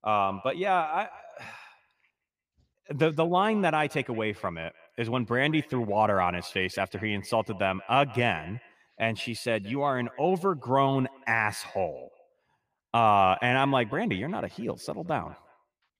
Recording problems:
echo of what is said; faint; throughout; 170 ms later, 20 dB below the speech

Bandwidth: 15 kHz